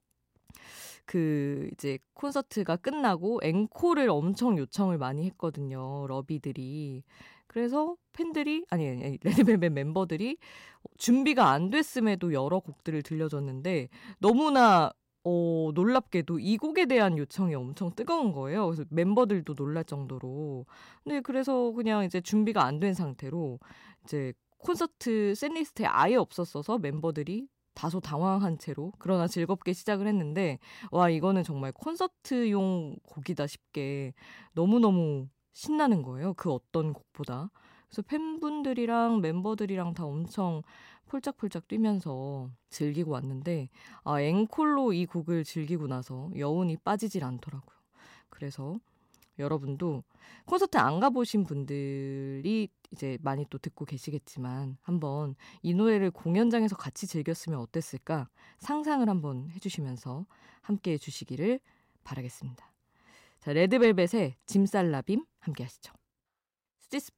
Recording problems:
none

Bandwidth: 16 kHz